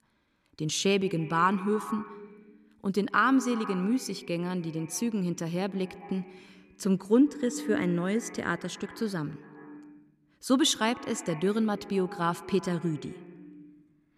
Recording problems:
echo of what is said; noticeable; throughout; 130 ms later, 15 dB below the speech

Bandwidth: 14 kHz